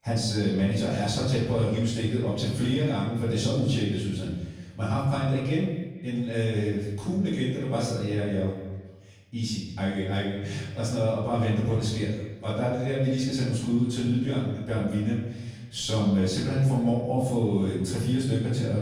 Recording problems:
off-mic speech; far
room echo; noticeable; dies away in 0.9 s
echo of what is said; faint; throughout; 230 ms later, 25 dB below the speech

